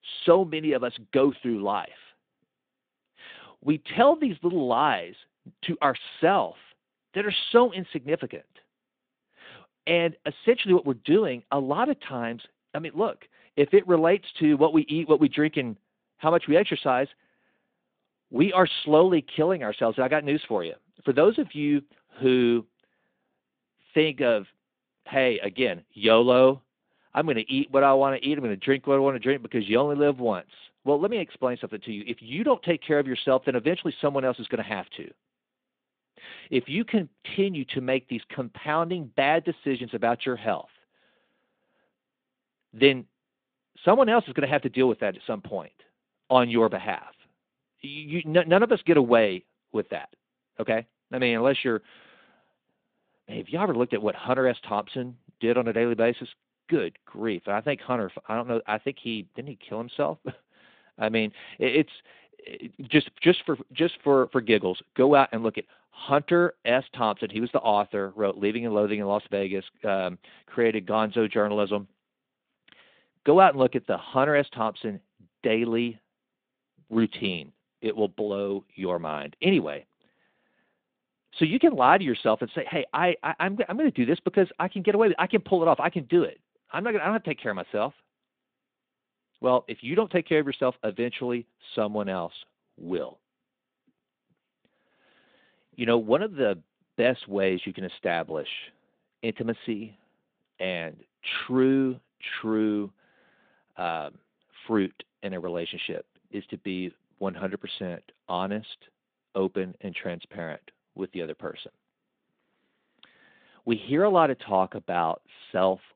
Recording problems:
phone-call audio; nothing above 3.5 kHz

